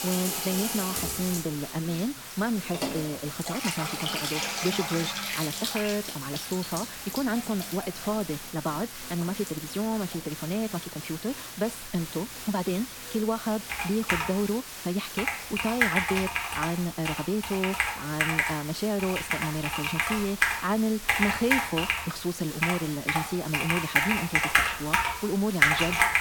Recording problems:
wrong speed, natural pitch; too fast; 1.5 times normal speed
household noises; very loud; throughout; 3 dB above the speech
hiss; loud; throughout; 7 dB below the speech

